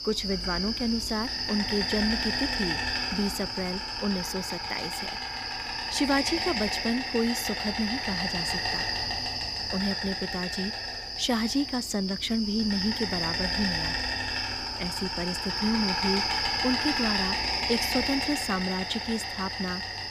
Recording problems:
animal sounds; very loud; throughout; 2 dB above the speech

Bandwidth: 15 kHz